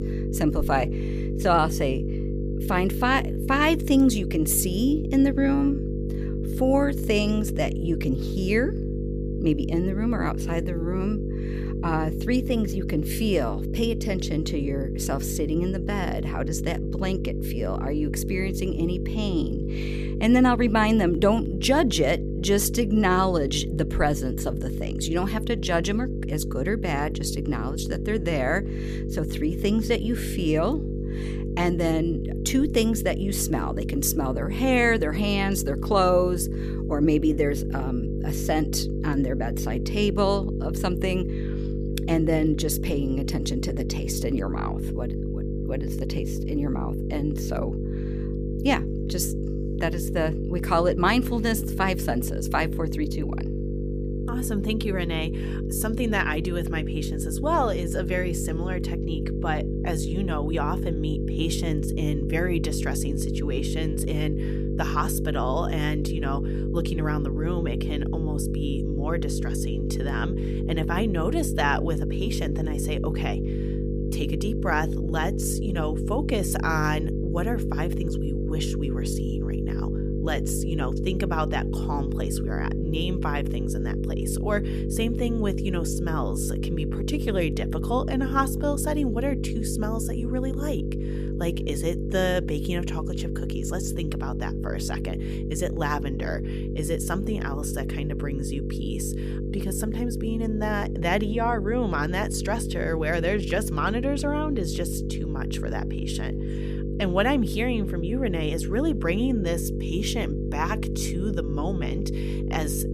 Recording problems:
electrical hum; loud; throughout; 50 Hz, 7 dB below the speech

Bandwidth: 14.5 kHz